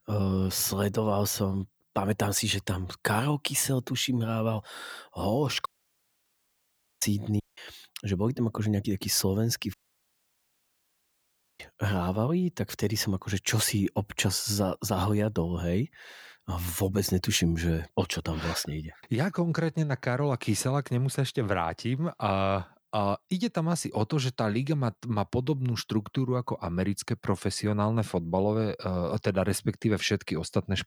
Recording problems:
audio cutting out; at 5.5 s for 1.5 s, at 7.5 s and at 9.5 s for 2 s

